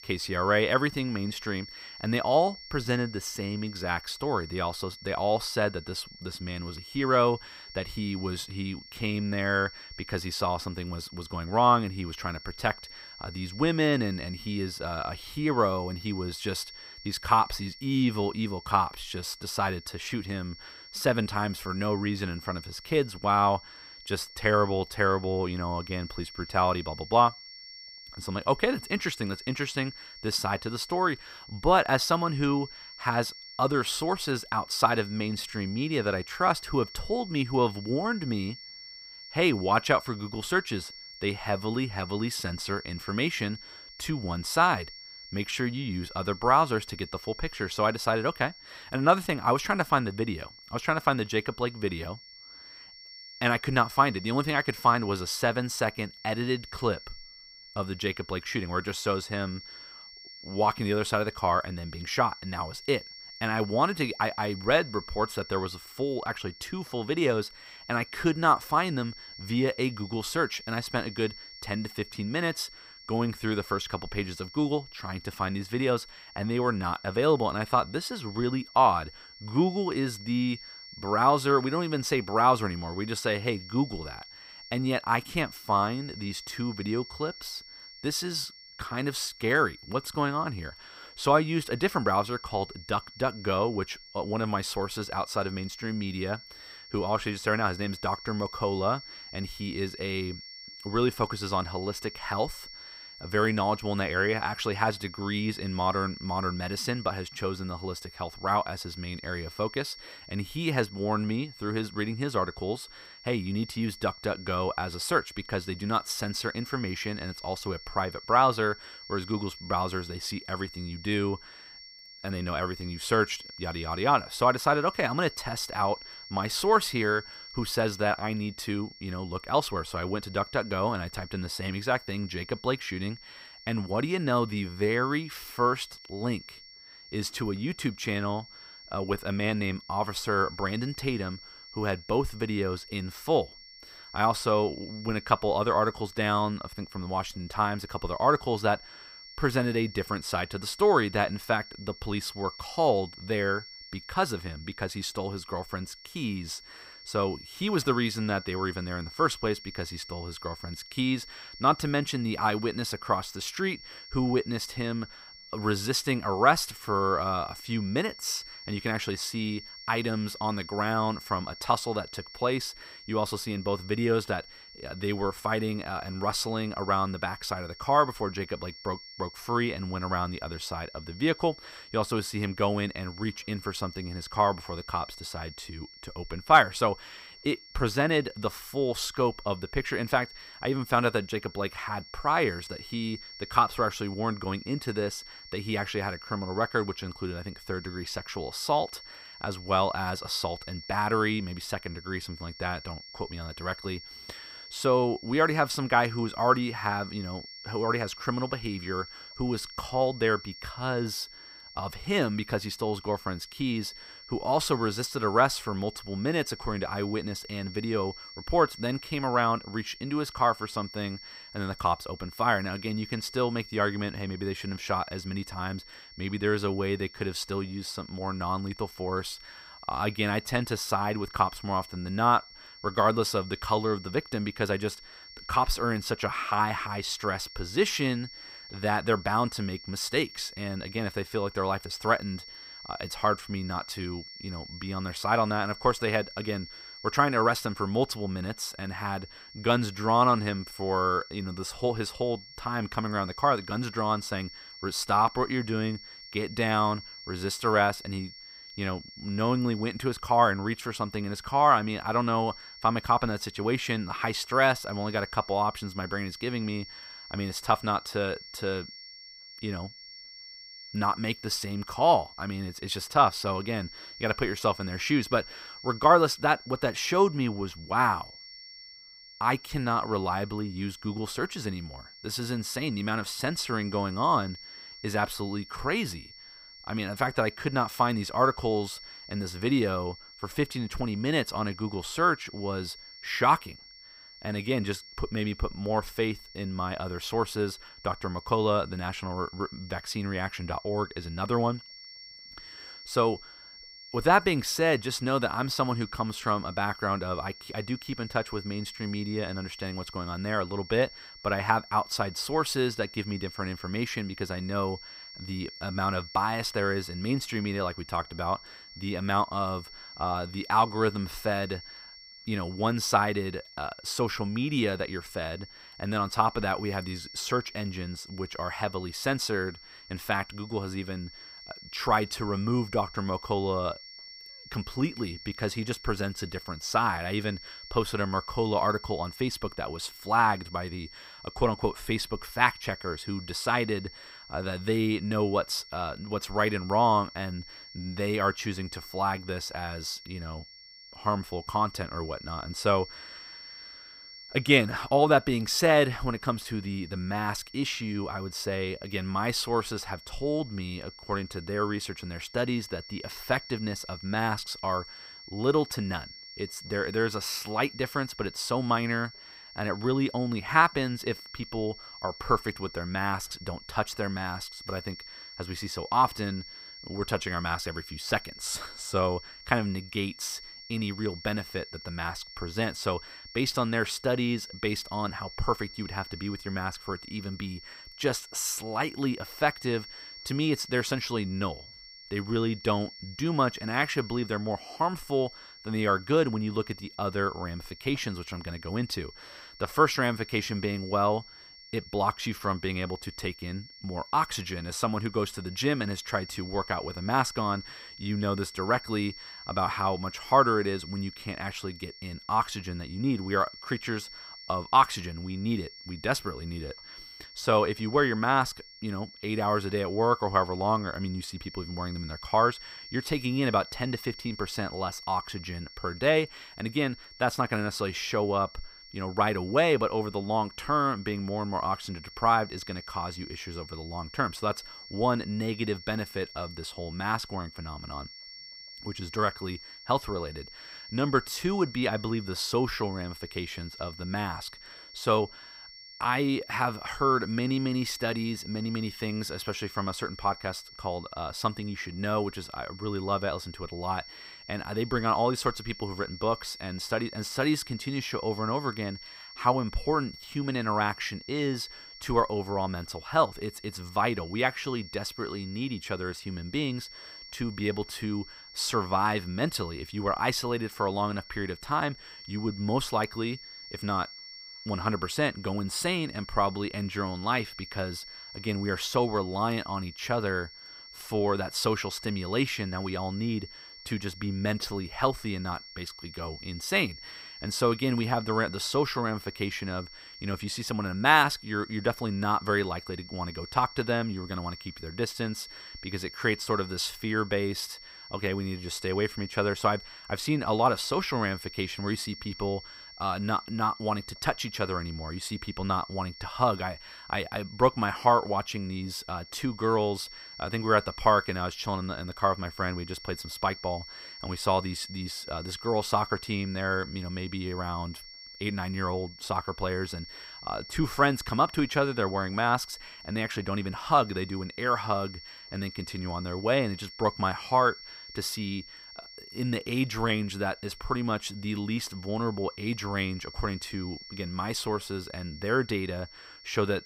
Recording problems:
high-pitched whine; noticeable; throughout; 5.5 kHz, 15 dB below the speech

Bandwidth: 15 kHz